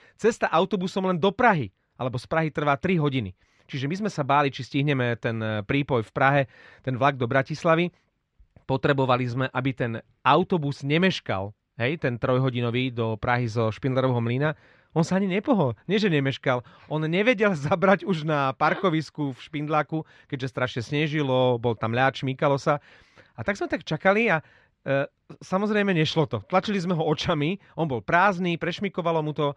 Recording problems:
muffled; slightly; fading above 3 kHz

